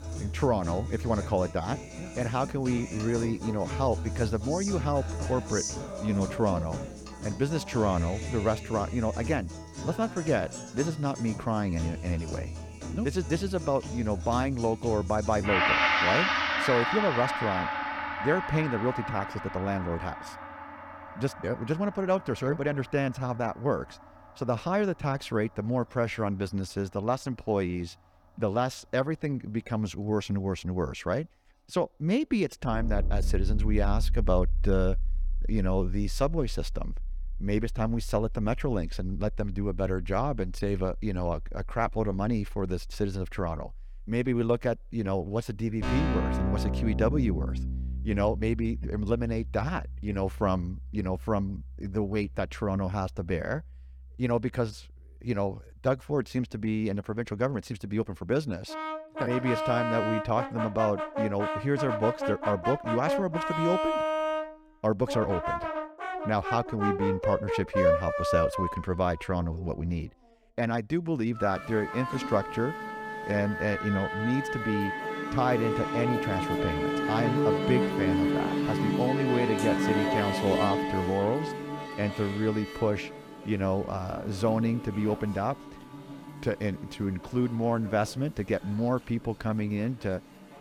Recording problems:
background music; loud; throughout; 2 dB below the speech

